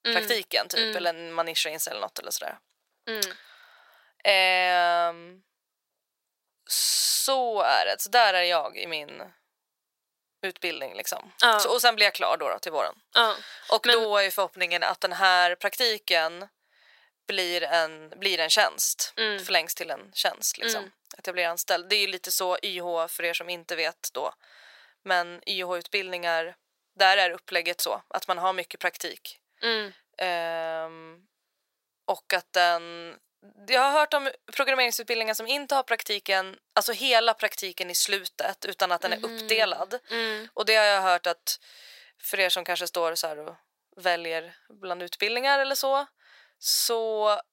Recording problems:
thin; very; fading below 700 Hz

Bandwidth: 16 kHz